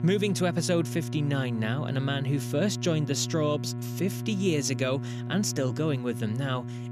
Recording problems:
electrical hum; noticeable; throughout; 60 Hz, 10 dB below the speech

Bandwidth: 14.5 kHz